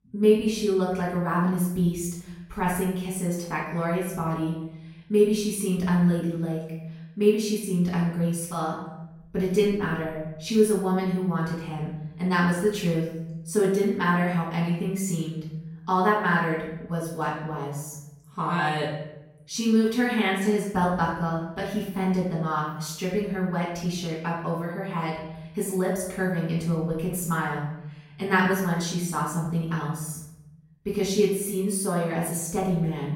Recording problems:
off-mic speech; far
room echo; noticeable; dies away in 0.8 s

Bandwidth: 16.5 kHz